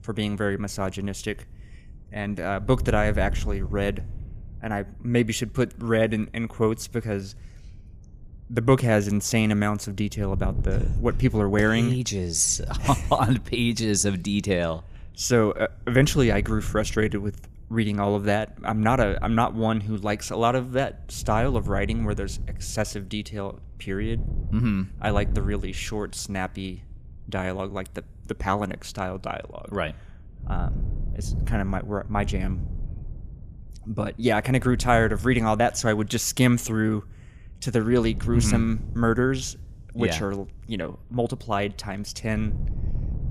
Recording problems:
wind noise on the microphone; occasional gusts; 20 dB below the speech

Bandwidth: 15 kHz